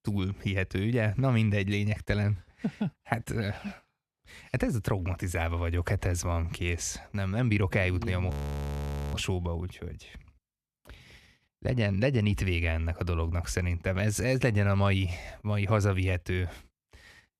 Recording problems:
audio freezing; at 8.5 s for 1 s

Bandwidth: 14.5 kHz